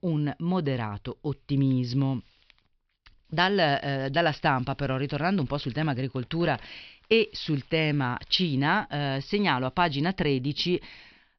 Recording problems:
high frequencies cut off; noticeable; nothing above 5.5 kHz

